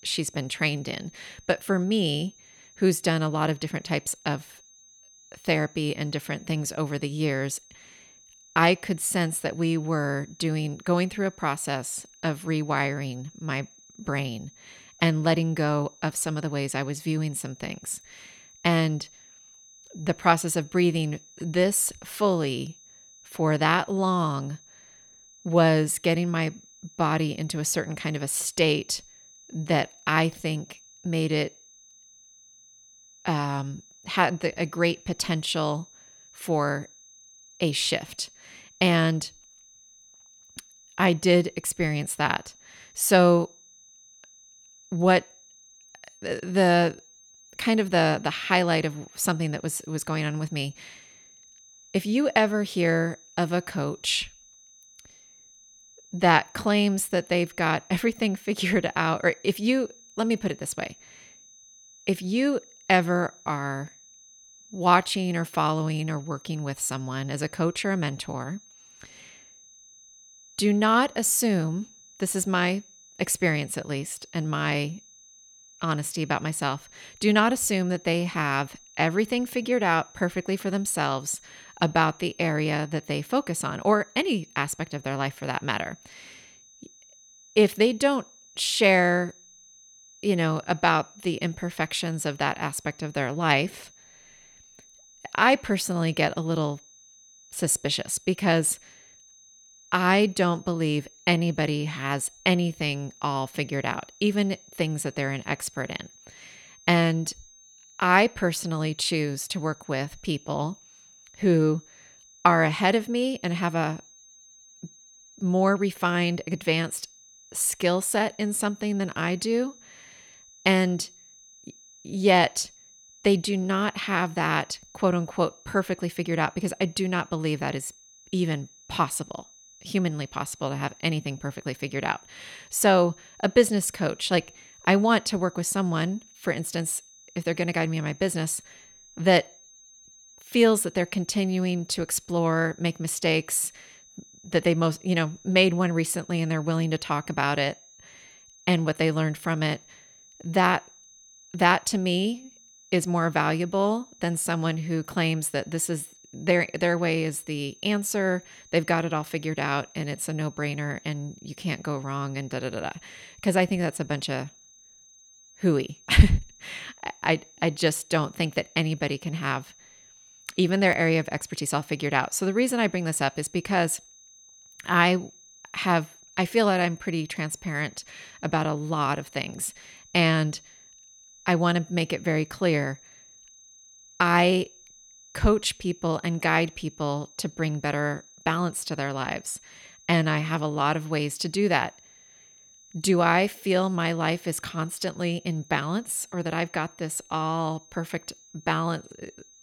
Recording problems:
high-pitched whine; faint; throughout; 6.5 kHz, 25 dB below the speech

